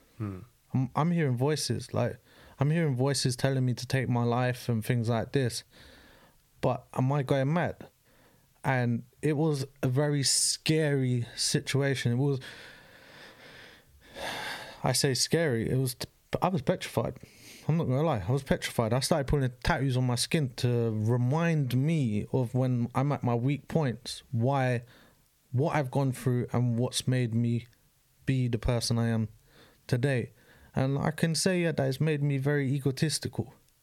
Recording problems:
squashed, flat; somewhat

